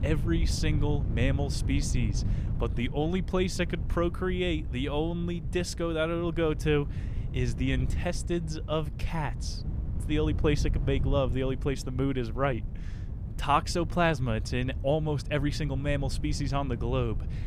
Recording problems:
wind noise on the microphone; occasional gusts; 15 dB below the speech

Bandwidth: 15 kHz